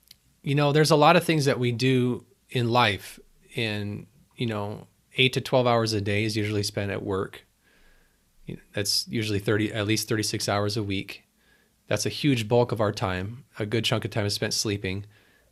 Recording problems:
none

